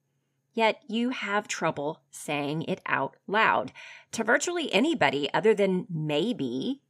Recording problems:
none

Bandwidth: 15 kHz